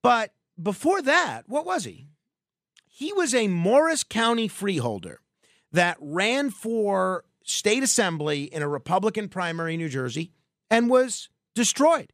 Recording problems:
none

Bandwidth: 14.5 kHz